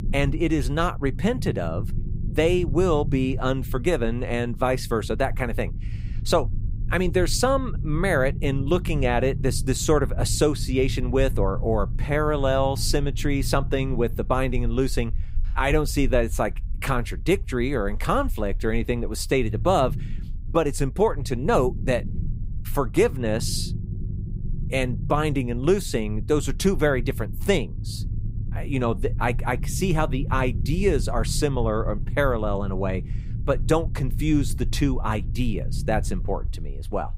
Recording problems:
low rumble; noticeable; throughout; 20 dB below the speech

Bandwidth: 15.5 kHz